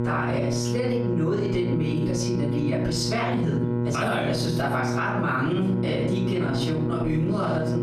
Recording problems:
off-mic speech; far
room echo; noticeable; dies away in 0.6 s
squashed, flat; somewhat
electrical hum; loud; throughout; 60 Hz, 6 dB below the speech

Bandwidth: 15 kHz